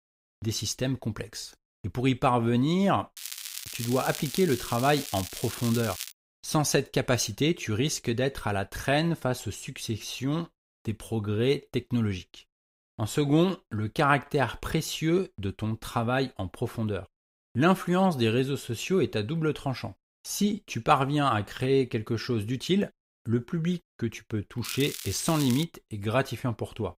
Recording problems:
crackling; loud; from 3 to 6 s and at 25 s; 9 dB below the speech

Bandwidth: 15.5 kHz